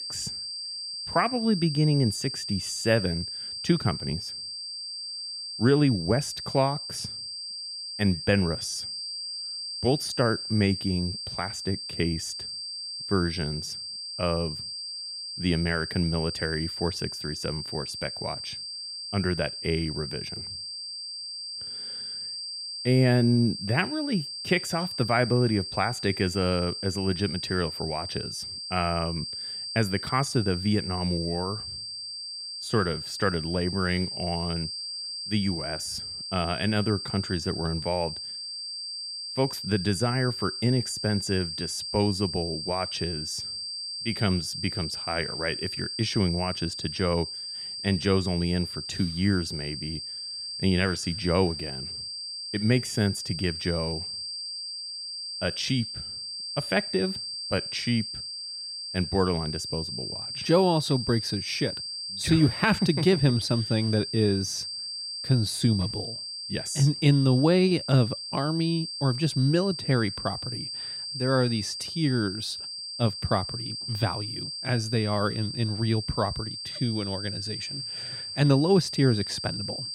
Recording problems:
high-pitched whine; loud; throughout; 4.5 kHz, 6 dB below the speech

